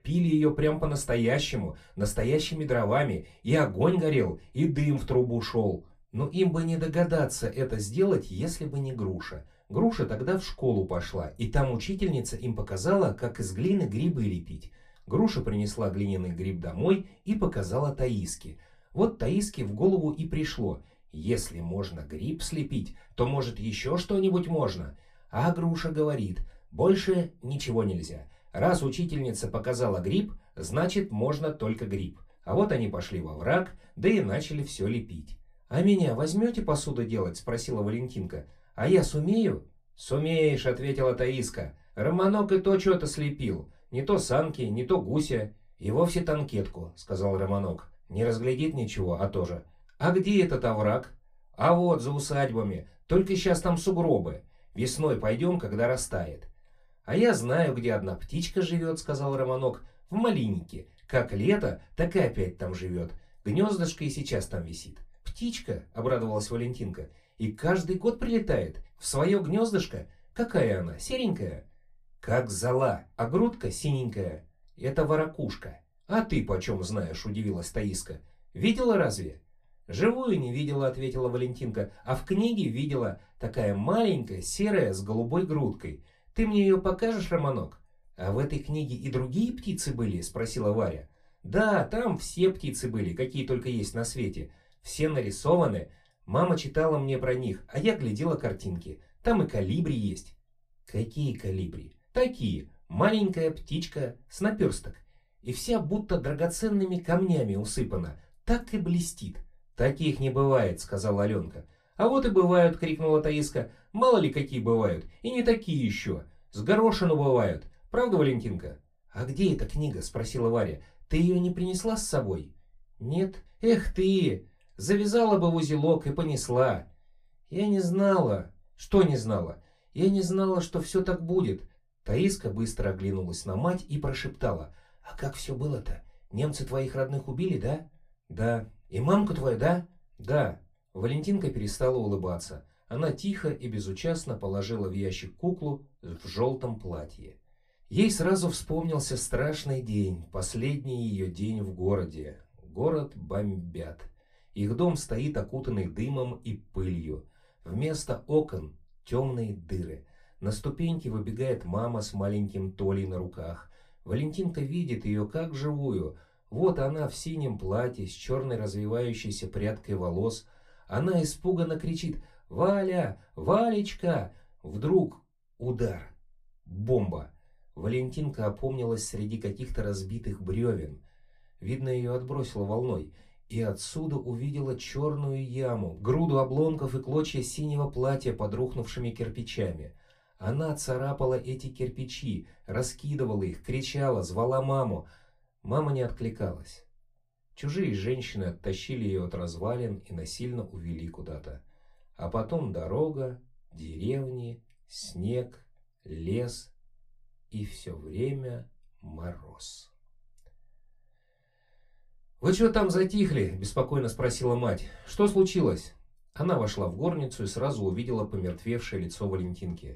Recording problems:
off-mic speech; far
room echo; very slight; dies away in 0.2 s

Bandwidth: 14.5 kHz